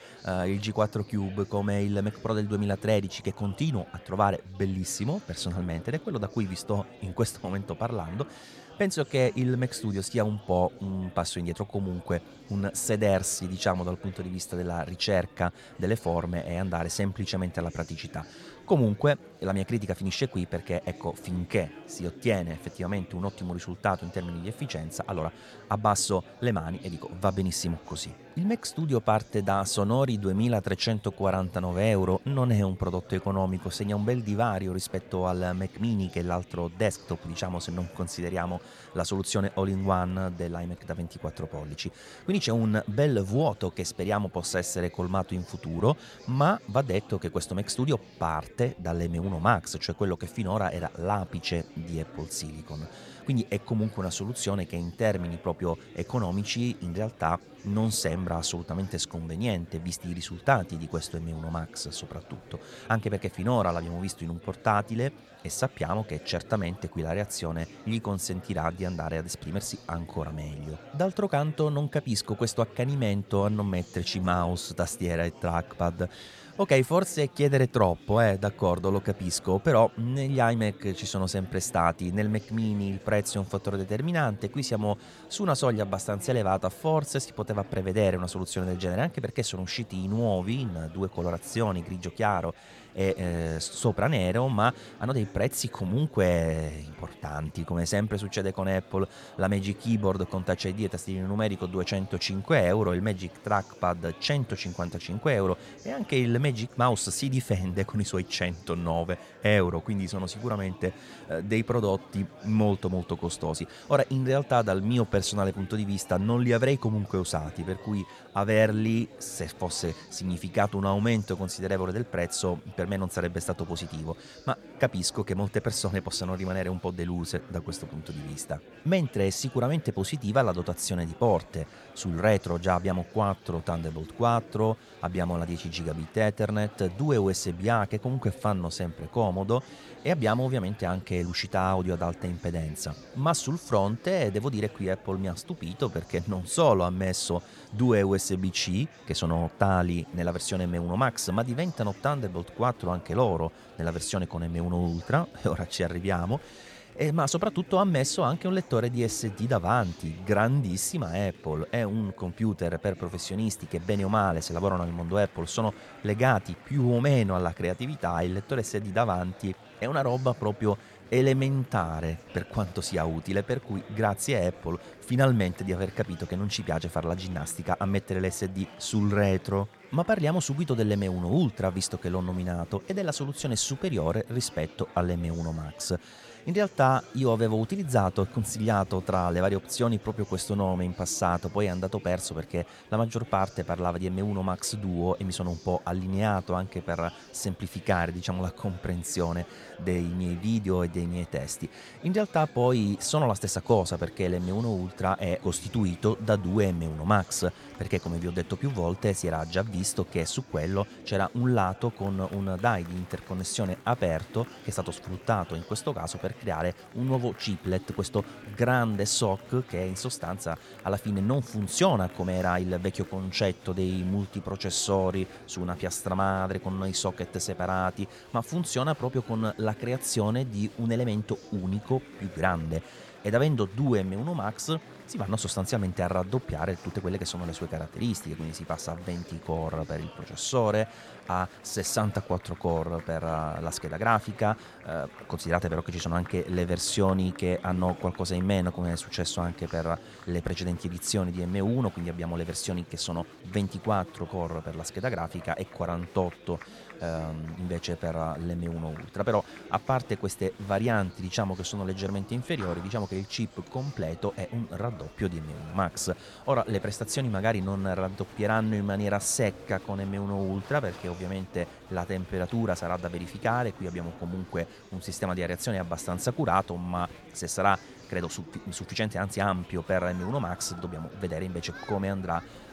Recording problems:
murmuring crowd; noticeable; throughout; 20 dB below the speech

